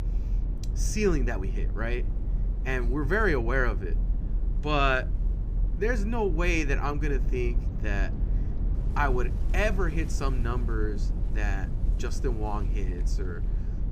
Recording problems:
low rumble; noticeable; throughout; 15 dB below the speech
household noises; faint; throughout; 25 dB below the speech

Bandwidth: 15 kHz